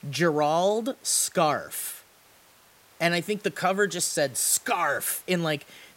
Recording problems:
hiss; faint; throughout; 30 dB below the speech

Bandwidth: 16 kHz